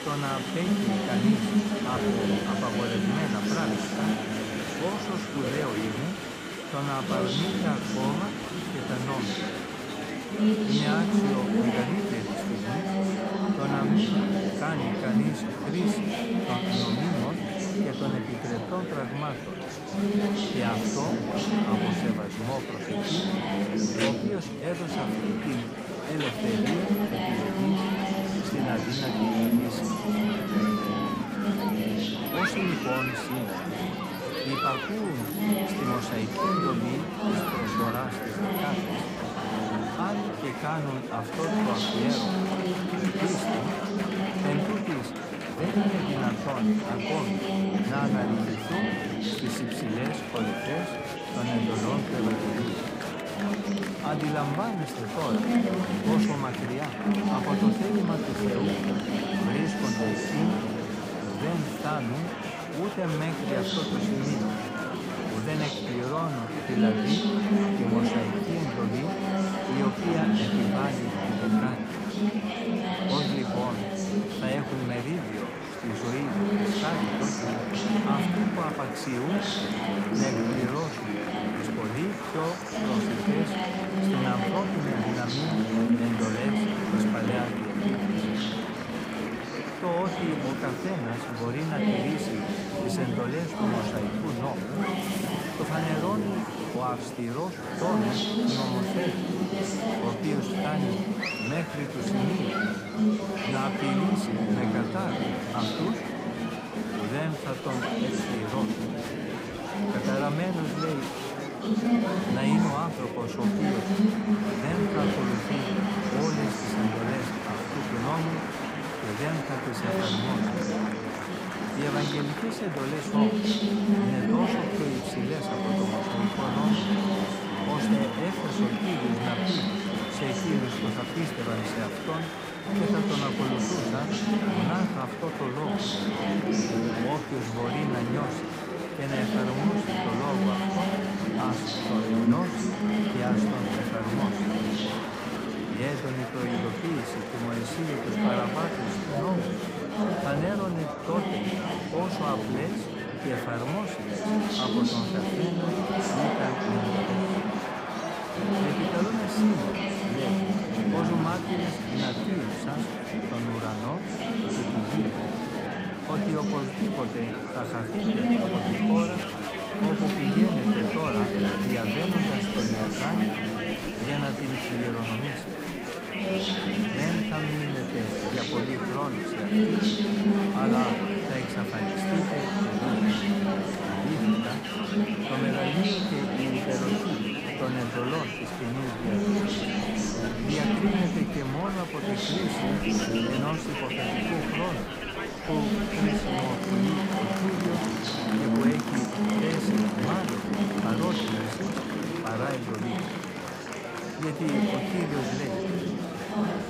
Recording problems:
murmuring crowd; very loud; throughout; 5 dB above the speech

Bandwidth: 15.5 kHz